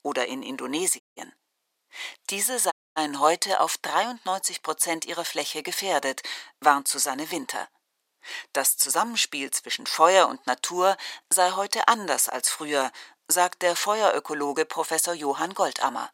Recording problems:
thin; very; fading below 550 Hz
audio cutting out; at 1 s and at 2.5 s

